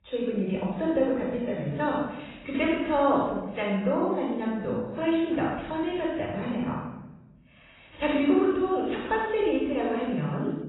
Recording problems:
room echo; strong; dies away in 1 s
off-mic speech; far
garbled, watery; badly; nothing above 4 kHz

